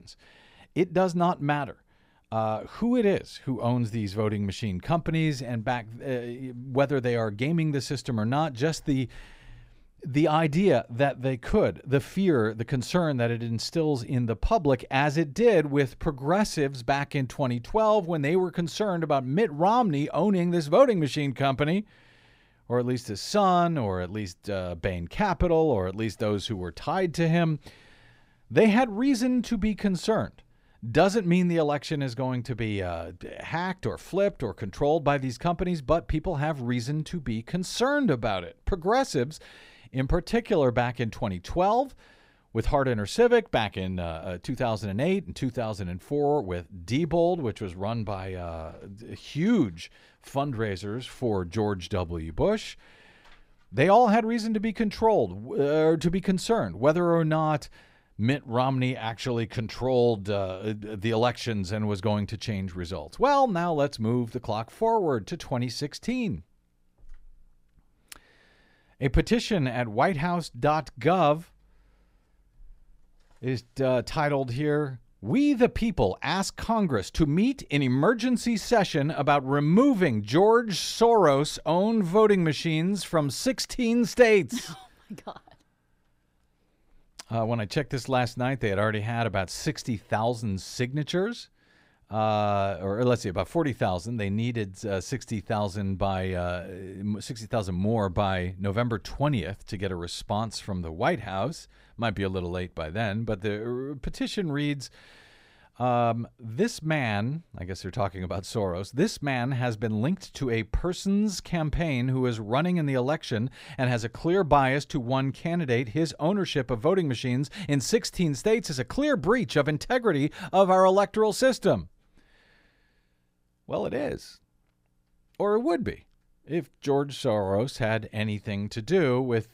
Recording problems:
none

